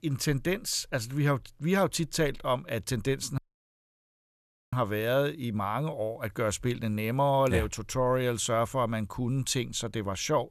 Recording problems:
audio cutting out; at 3.5 s for 1.5 s

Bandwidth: 13.5 kHz